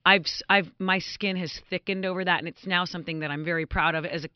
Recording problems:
high frequencies cut off; noticeable; nothing above 5.5 kHz

